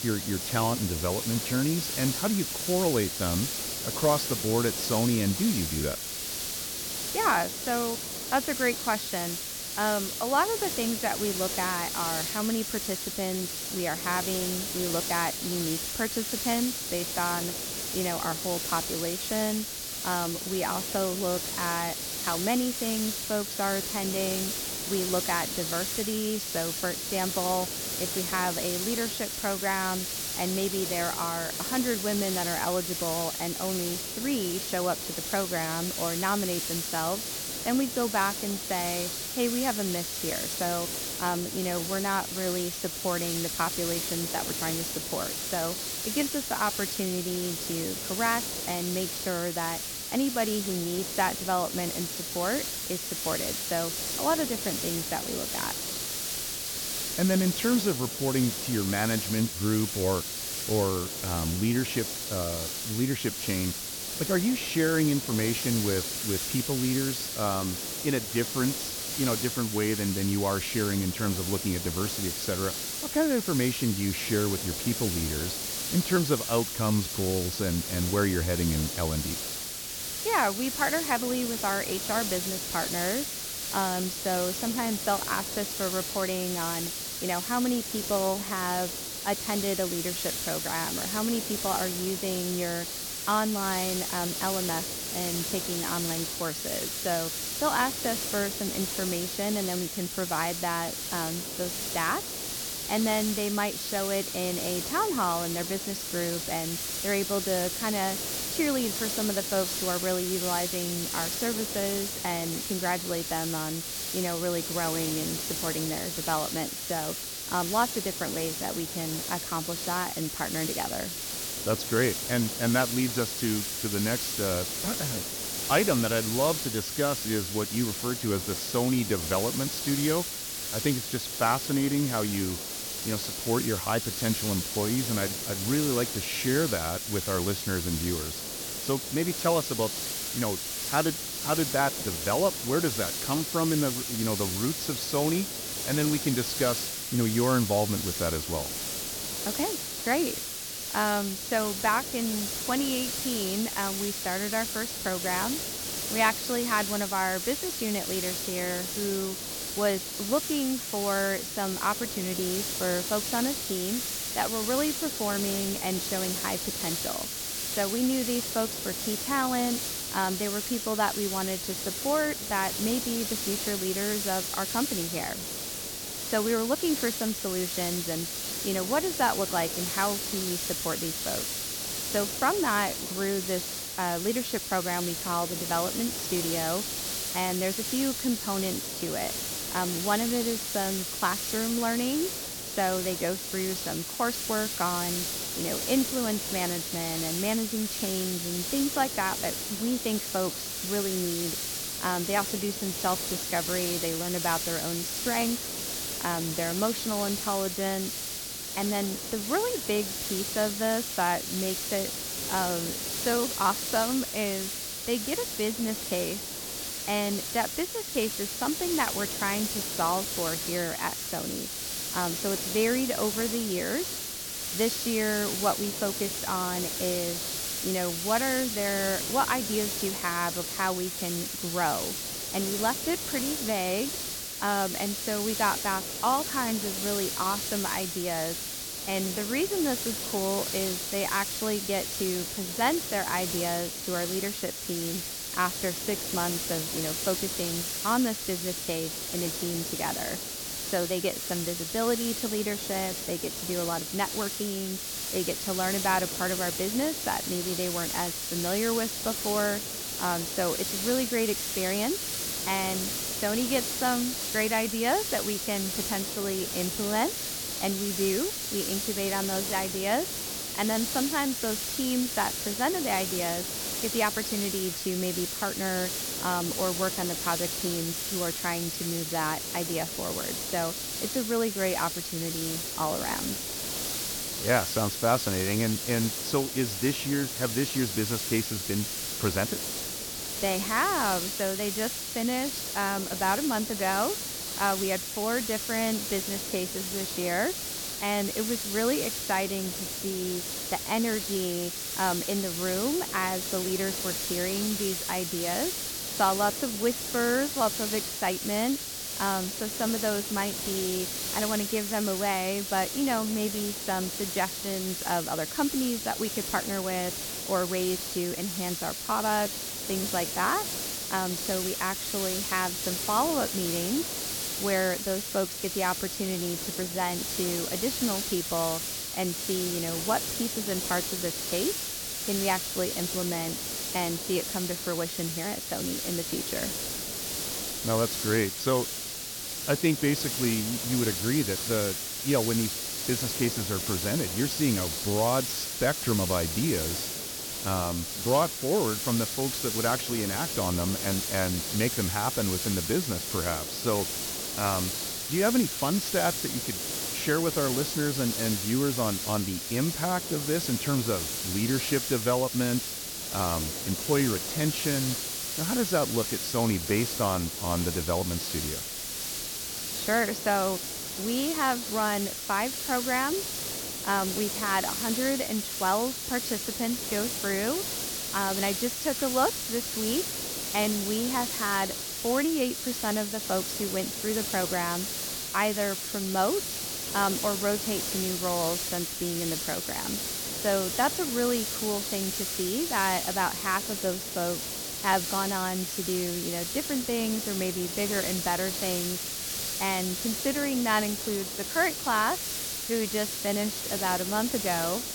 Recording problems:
high frequencies cut off; noticeable; nothing above 6.5 kHz
hiss; loud; throughout; 1 dB below the speech

